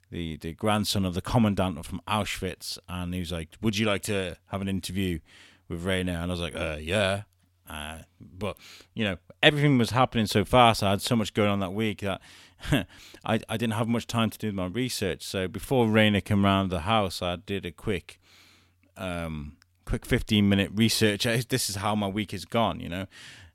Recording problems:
none

